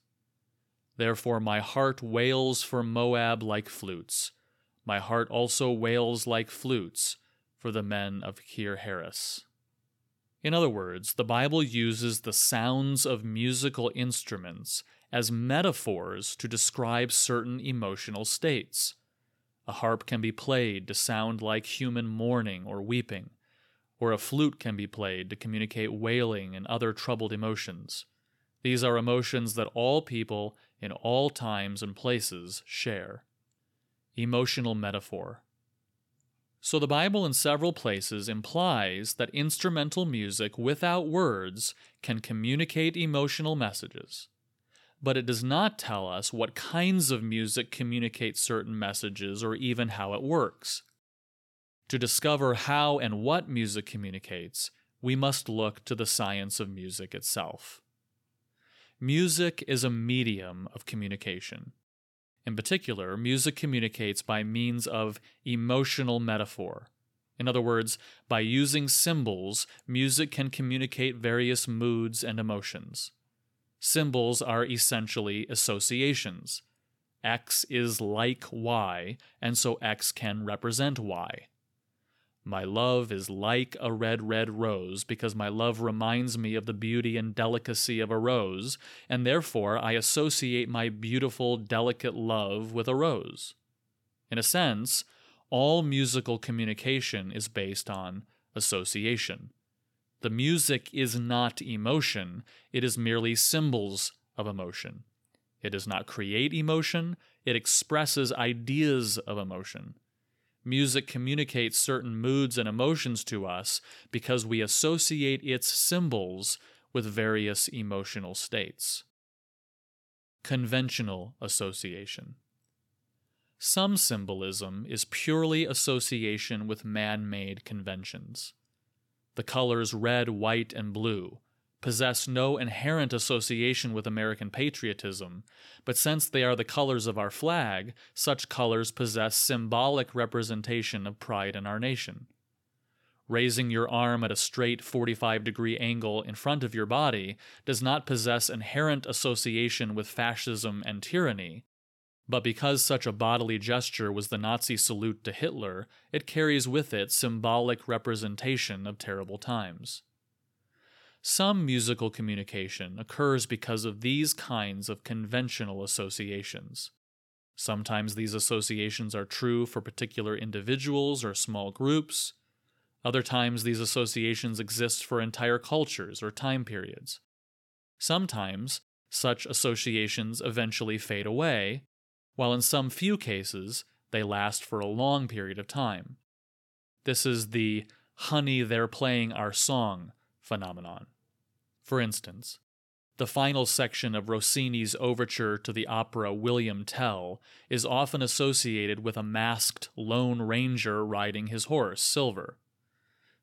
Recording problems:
none

